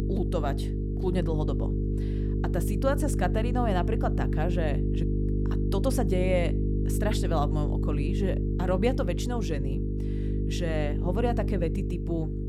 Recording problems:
electrical hum; loud; throughout; 50 Hz, 5 dB below the speech

